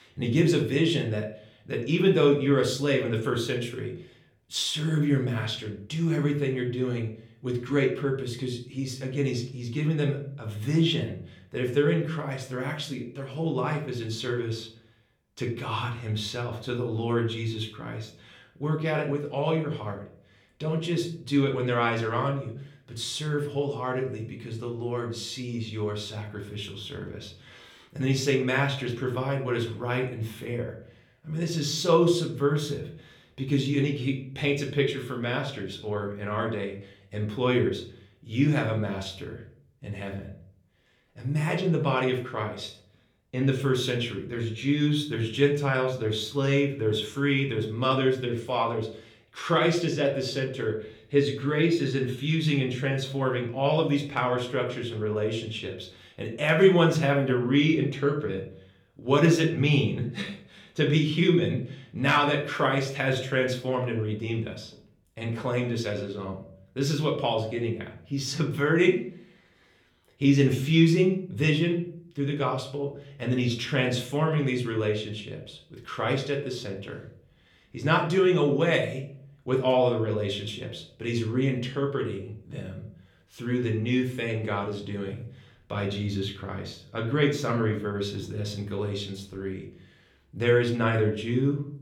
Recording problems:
room echo; slight; dies away in 0.4 s
off-mic speech; somewhat distant

